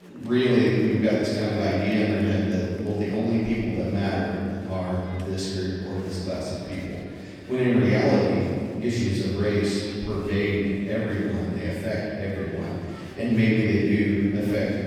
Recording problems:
room echo; strong; dies away in 2 s
off-mic speech; far
murmuring crowd; faint; throughout; 25 dB below the speech

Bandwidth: 18 kHz